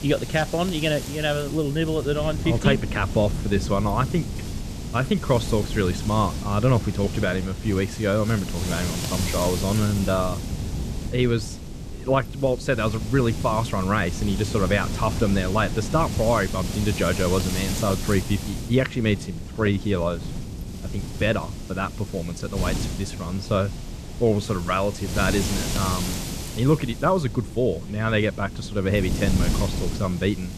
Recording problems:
wind noise on the microphone; heavy; 10 dB below the speech

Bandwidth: 14 kHz